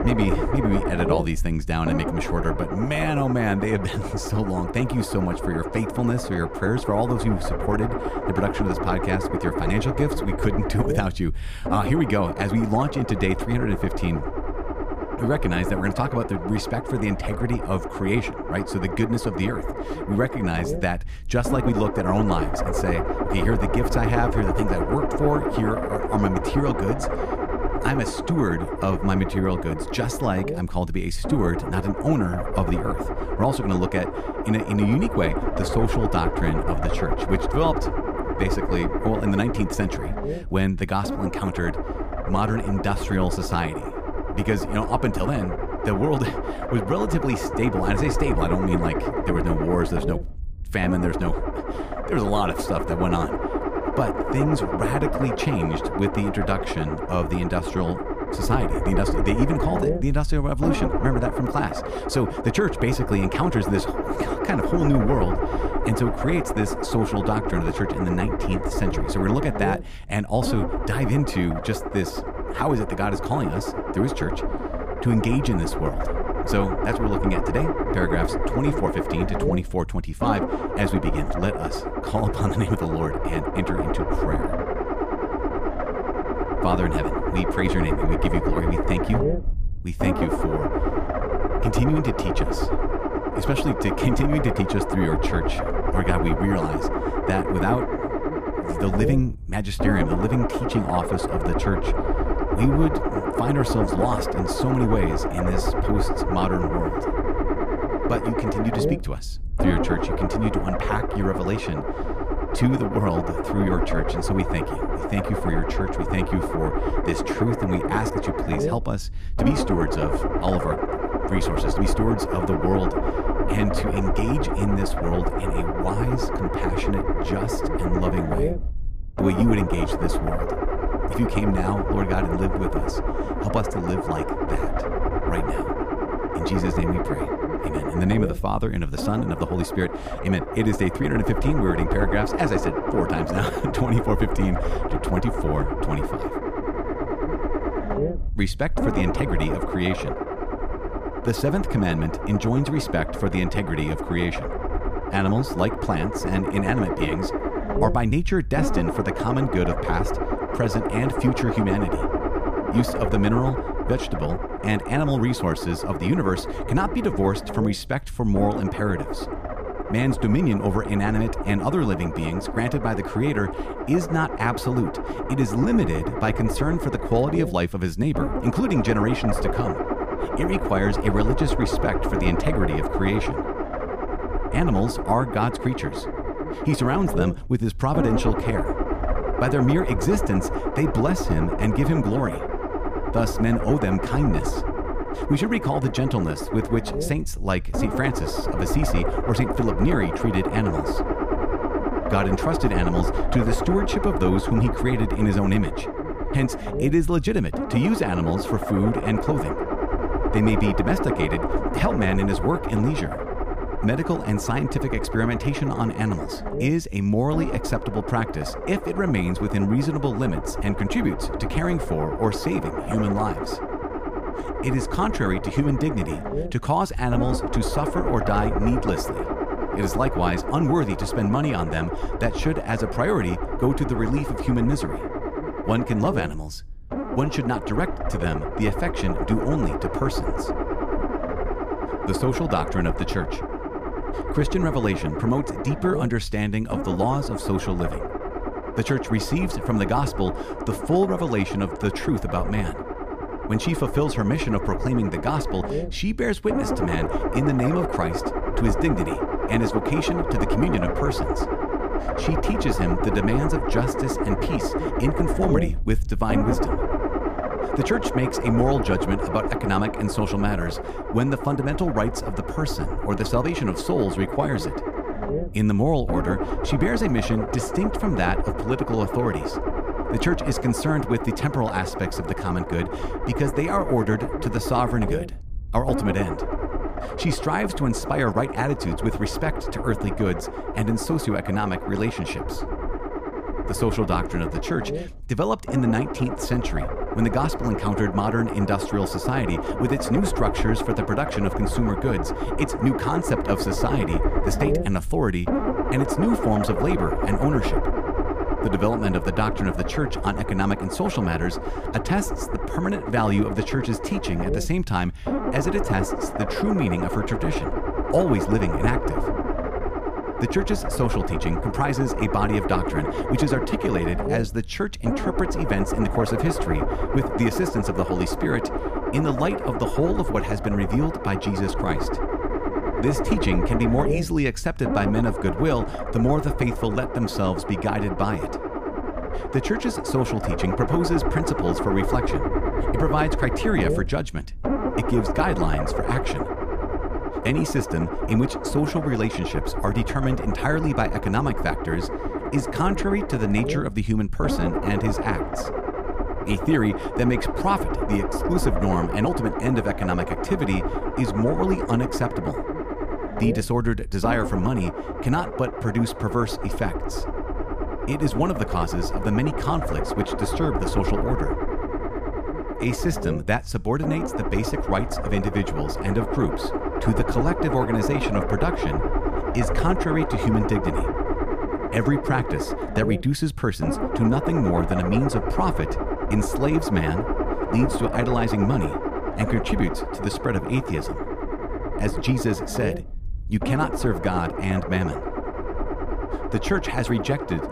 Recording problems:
low rumble; loud; throughout; 1 dB below the speech

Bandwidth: 15 kHz